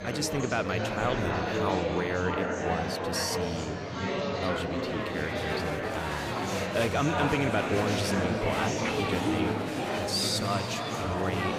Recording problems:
echo of what is said; strong; throughout; 270 ms later, 7 dB below the speech
murmuring crowd; very loud; throughout; 1 dB above the speech

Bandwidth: 15 kHz